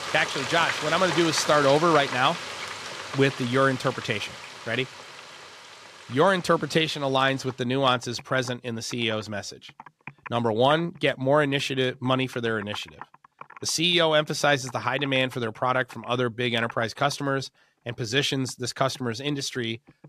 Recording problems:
household noises; noticeable; throughout; 10 dB below the speech

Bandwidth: 14.5 kHz